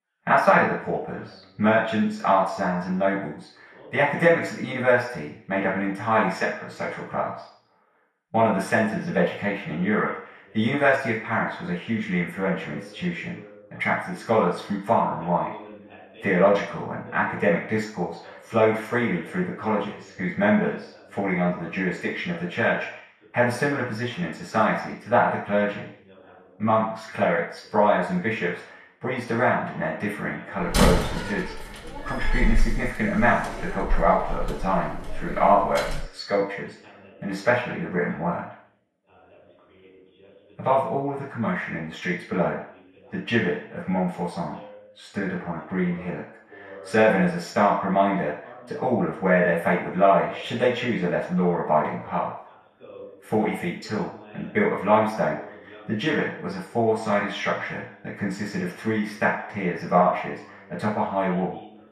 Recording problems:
off-mic speech; far
room echo; noticeable; dies away in 0.6 s
garbled, watery; slightly; nothing above 12.5 kHz
voice in the background; faint; throughout; 25 dB below the speech
door banging; loud; from 31 to 36 s; peak 3 dB above the speech

